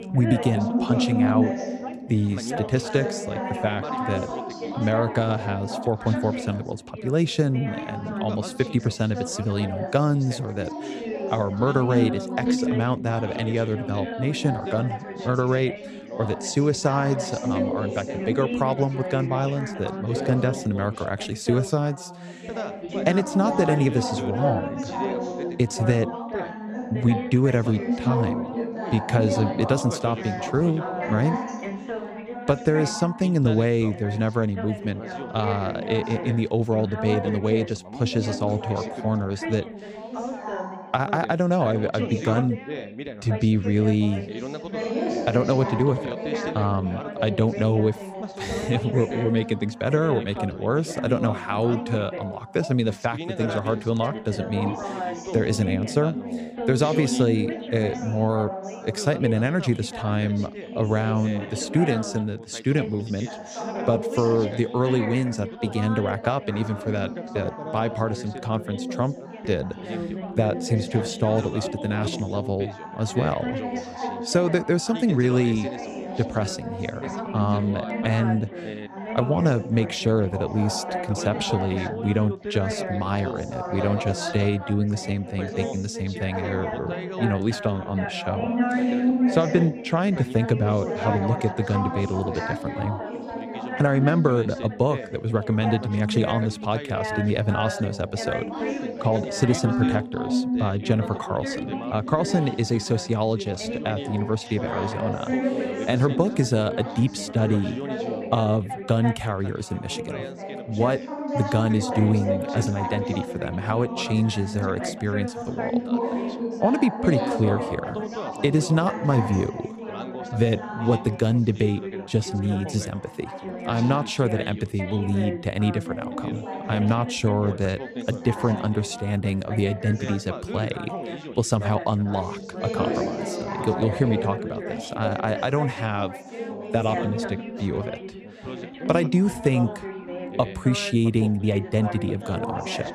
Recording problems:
background chatter; loud; throughout; 4 voices, 6 dB below the speech

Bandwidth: 15 kHz